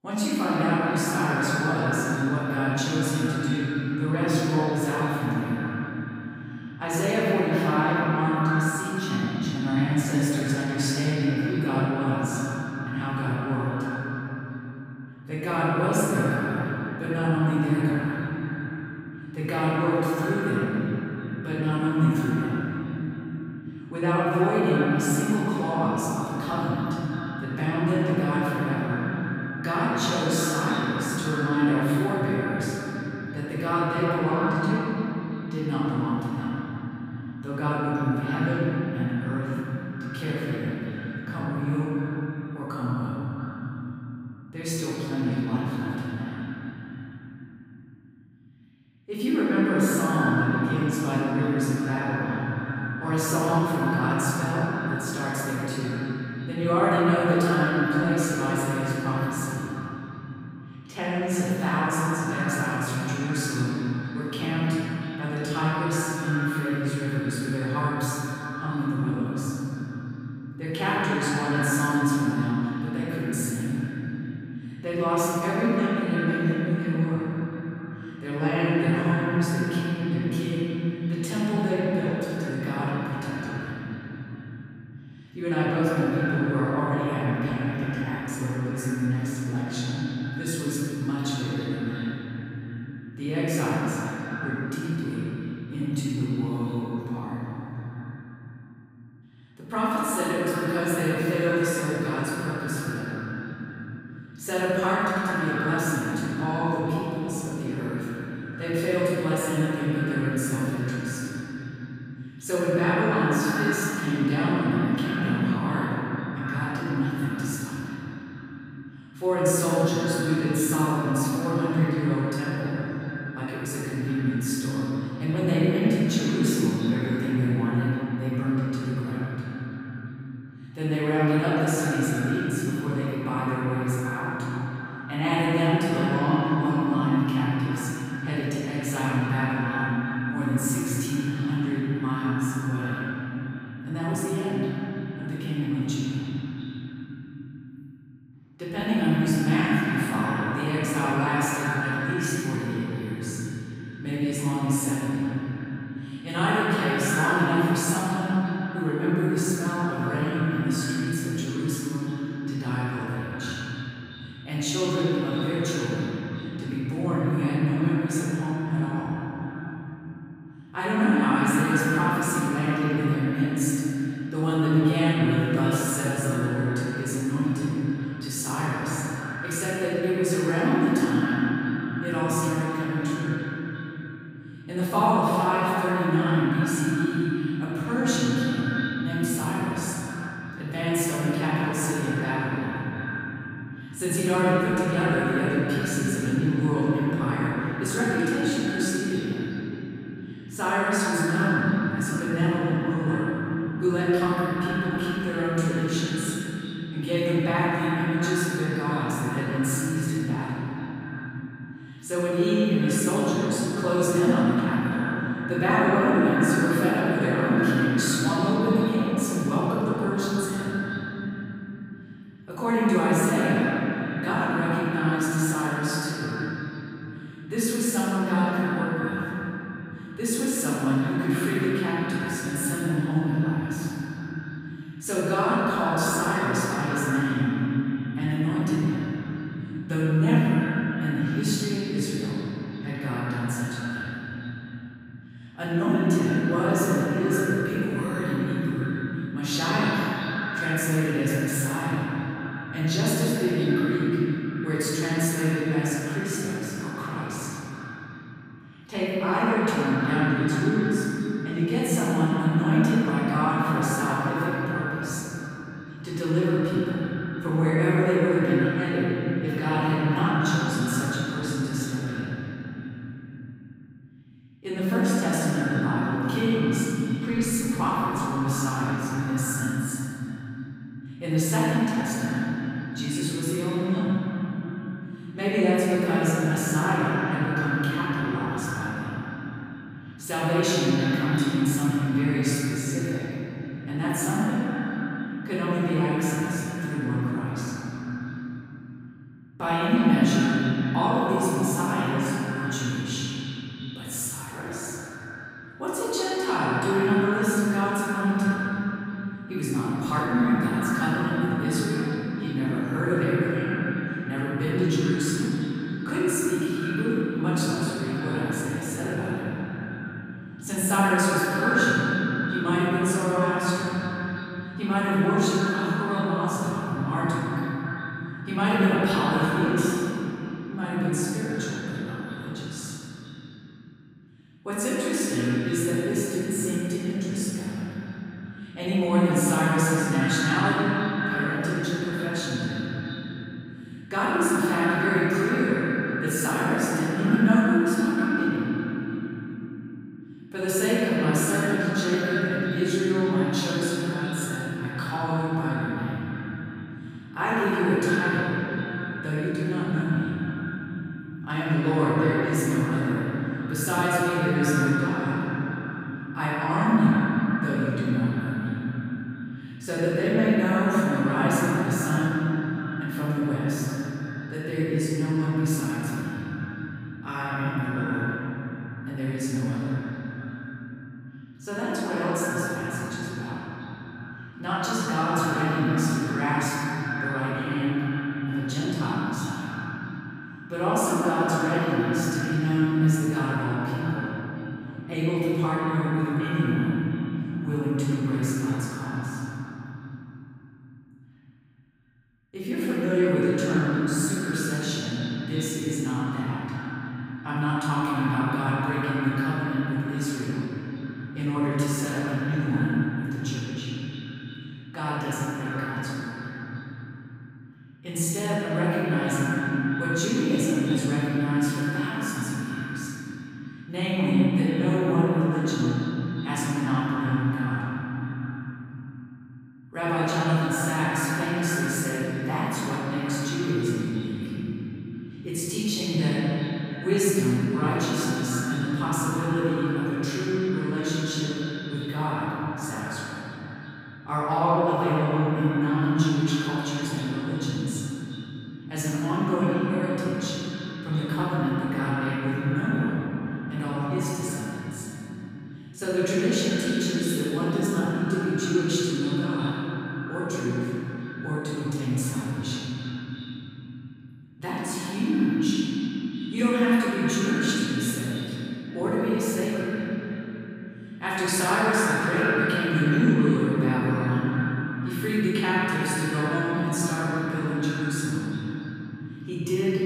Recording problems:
echo of what is said; strong; throughout; 340 ms later, 10 dB below the speech
room echo; strong; dies away in 3 s
off-mic speech; far

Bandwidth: 15.5 kHz